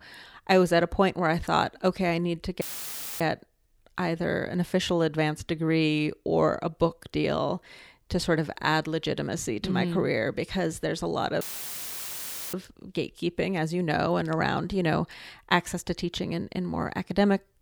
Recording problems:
audio cutting out; filled with static; at 2.5 s for 0.5 s and at 11 s for 1 s

